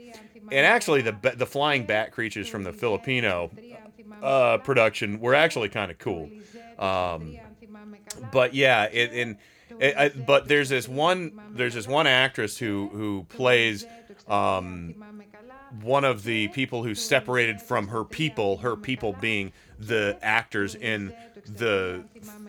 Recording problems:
voice in the background; faint; throughout; 25 dB below the speech

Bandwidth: 18.5 kHz